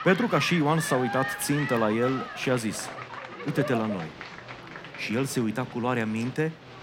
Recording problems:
crowd noise; loud; throughout; 8 dB below the speech
voice in the background; faint; throughout; 25 dB below the speech

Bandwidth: 16.5 kHz